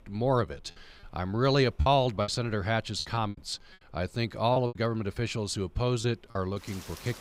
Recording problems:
rain or running water; faint; throughout; 25 dB below the speech
choppy; very; from 2 to 3.5 s and from 4.5 to 6.5 s; 9% of the speech affected

